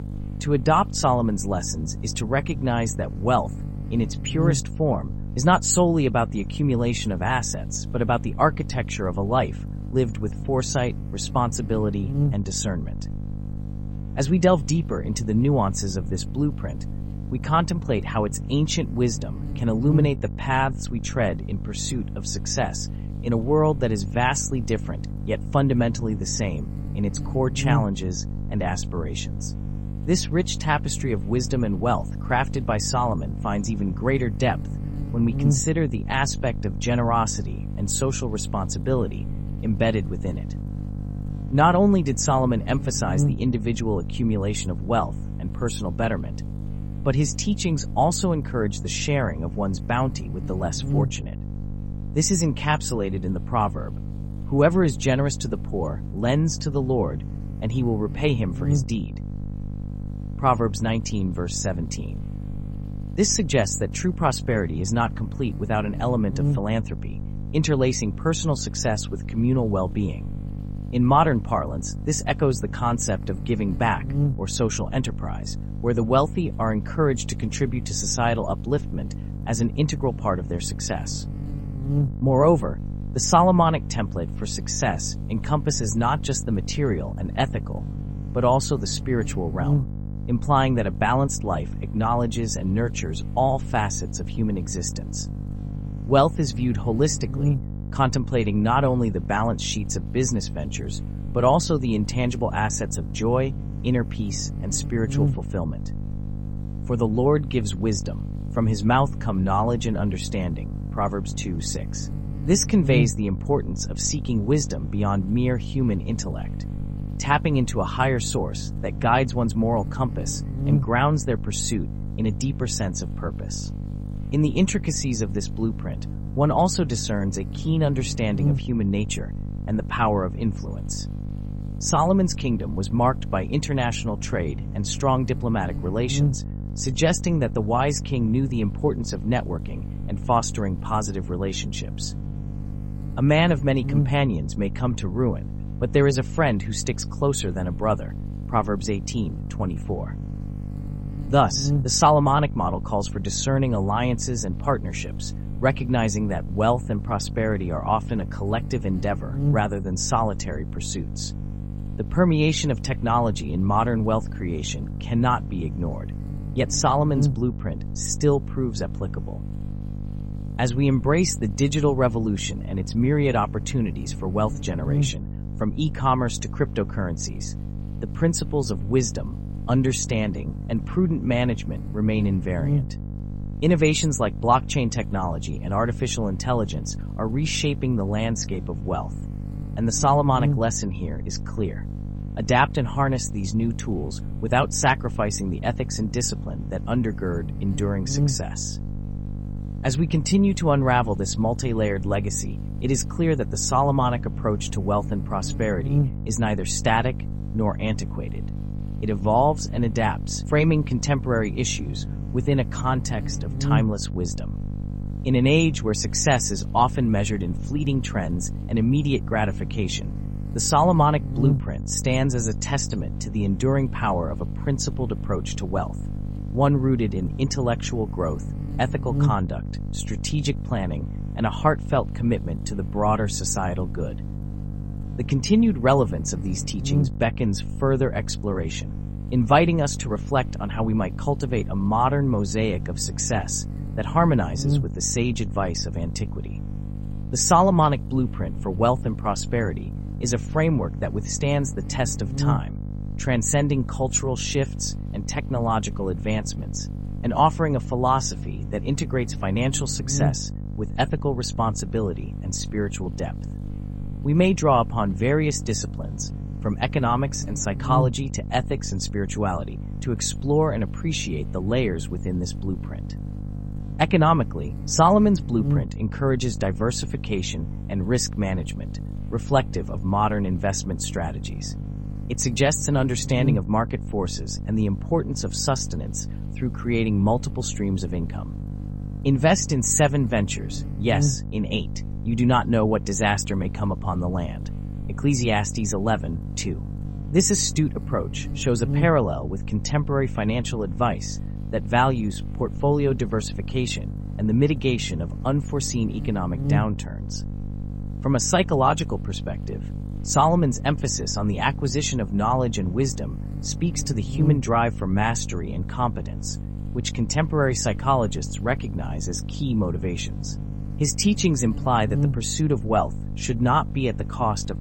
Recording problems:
electrical hum; noticeable; throughout; 50 Hz, 15 dB below the speech

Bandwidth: 16 kHz